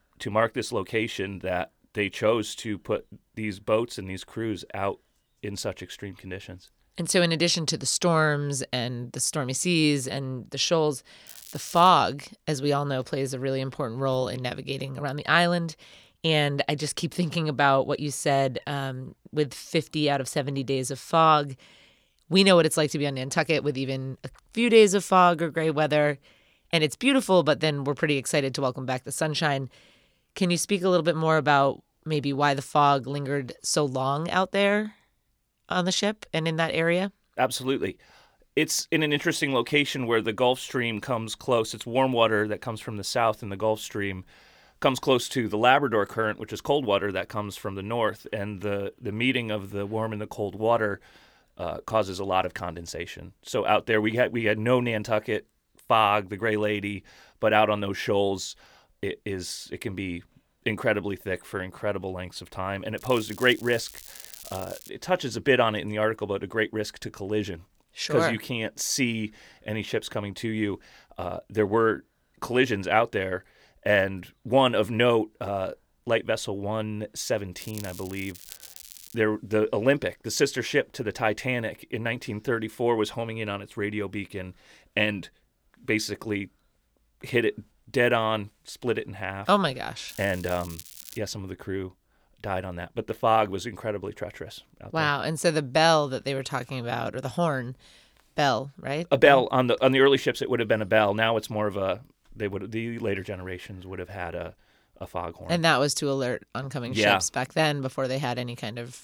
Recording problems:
crackling; noticeable; 4 times, first at 11 s; 15 dB below the speech

